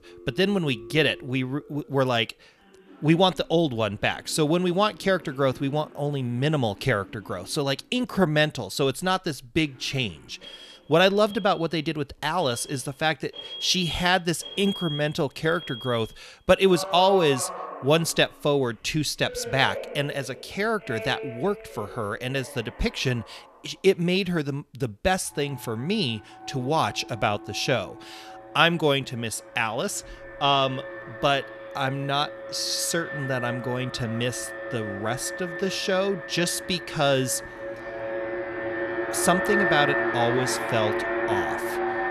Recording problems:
alarms or sirens; loud; throughout; 7 dB below the speech

